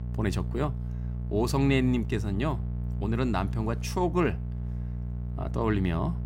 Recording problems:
electrical hum; noticeable; throughout; 60 Hz, 15 dB below the speech

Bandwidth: 16 kHz